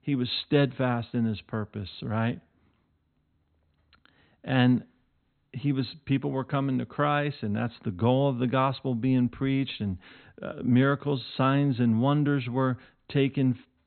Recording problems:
high frequencies cut off; severe; nothing above 4 kHz

